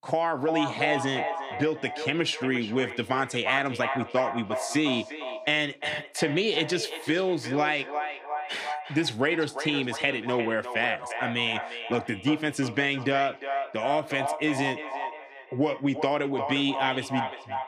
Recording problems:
echo of what is said; strong; throughout; 350 ms later, 7 dB below the speech

